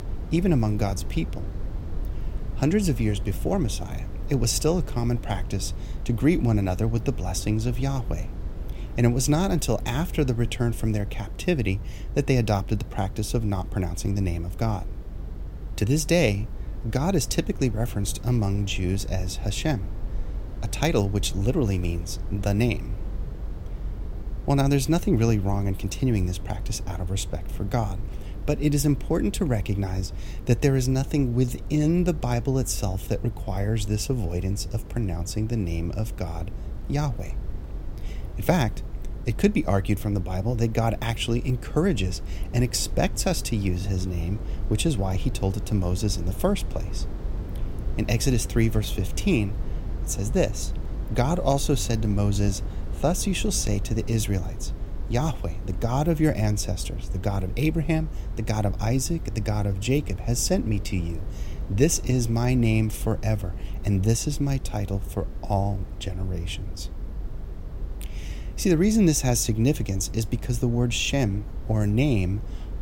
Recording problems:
low rumble; noticeable; throughout; 15 dB below the speech

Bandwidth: 16 kHz